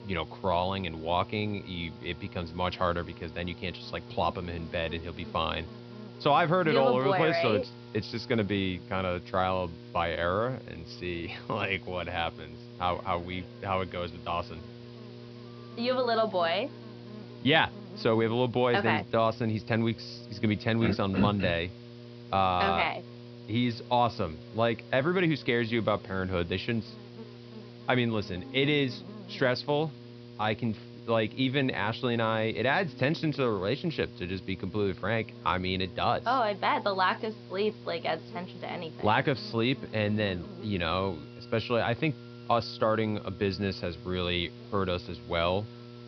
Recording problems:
high frequencies cut off; noticeable; nothing above 5.5 kHz
electrical hum; faint; throughout; 60 Hz, 20 dB below the speech
background music; faint; throughout; 30 dB below the speech
hiss; faint; throughout; 25 dB below the speech

